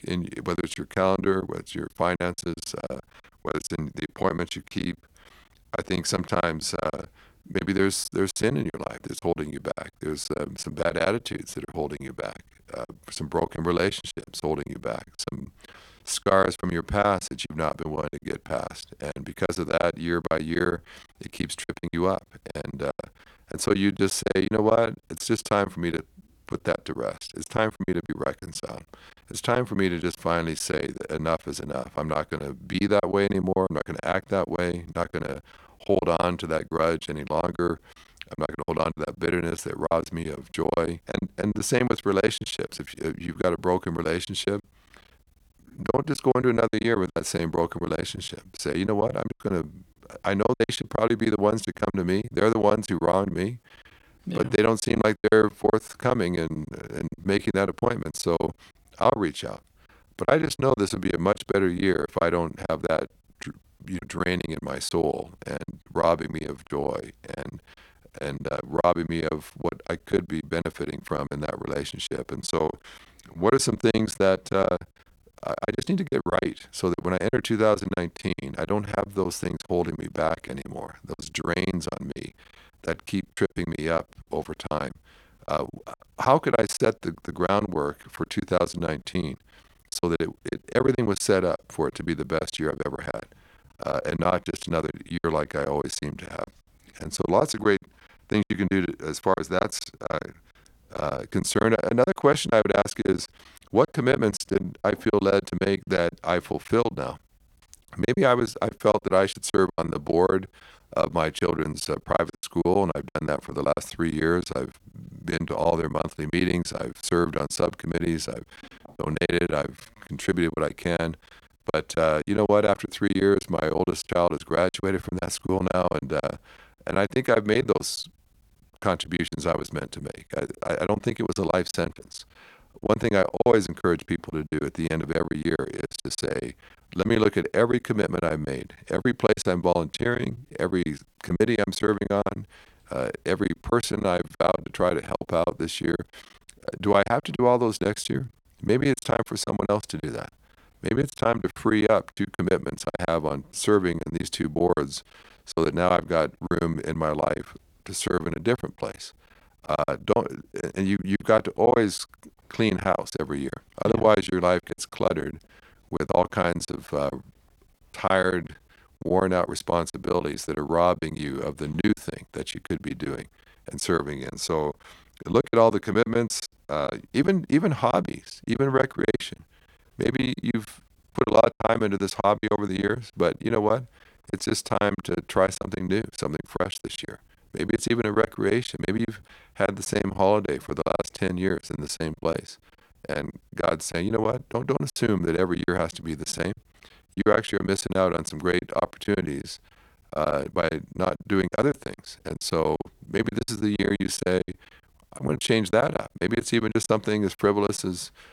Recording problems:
choppy; very; 18% of the speech affected

